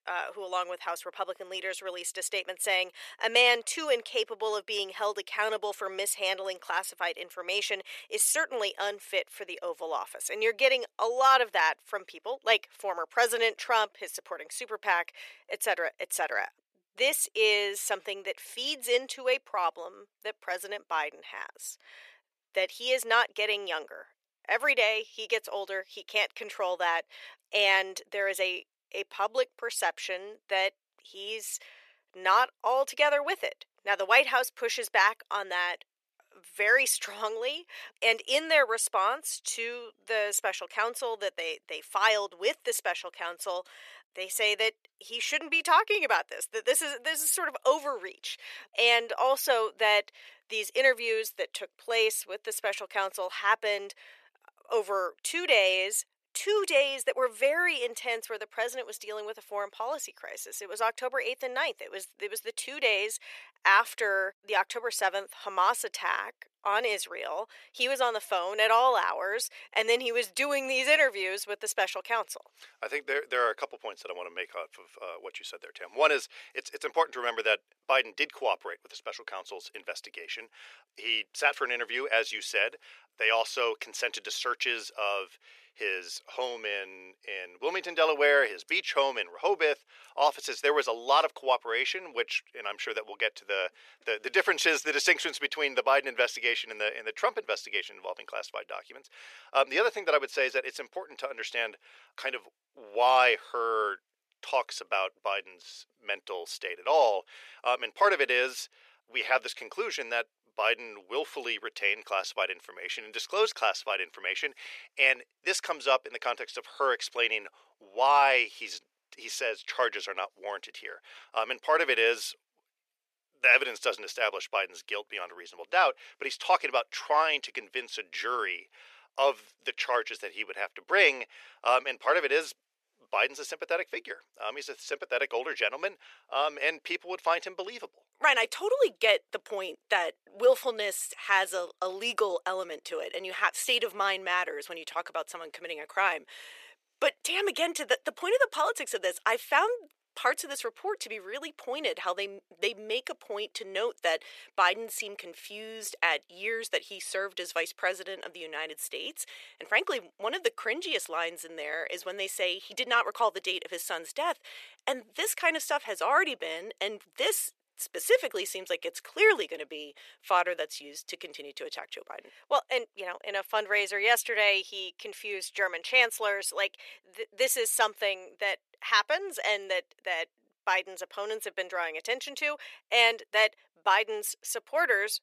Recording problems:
thin; very; fading below 450 Hz

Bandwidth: 14 kHz